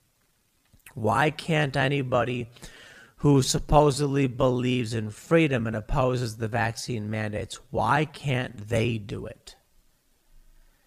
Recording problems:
wrong speed, natural pitch; too slow; 0.6 times normal speed

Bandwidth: 15 kHz